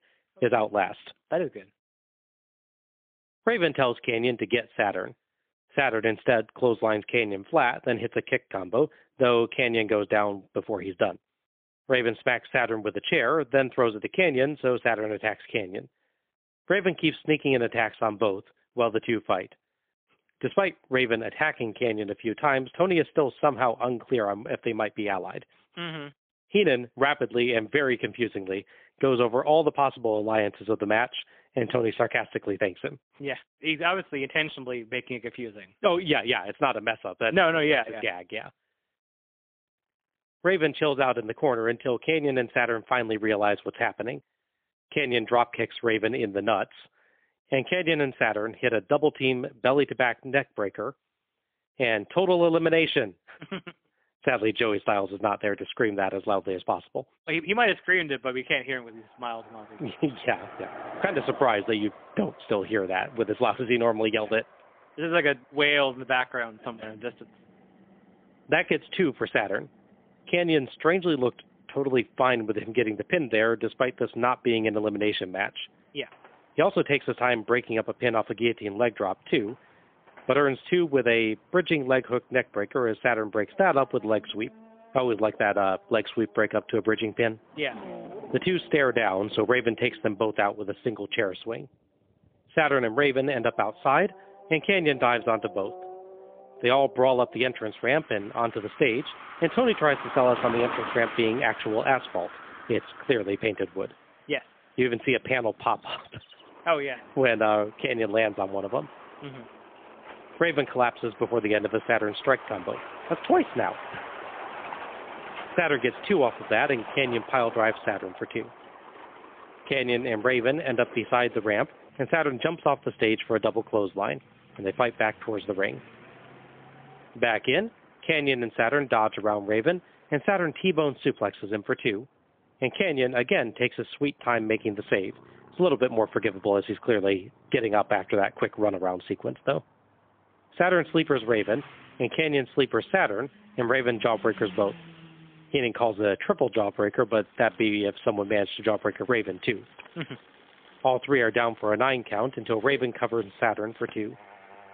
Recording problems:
phone-call audio; poor line; nothing above 3.5 kHz
traffic noise; noticeable; from 58 s on; 20 dB below the speech

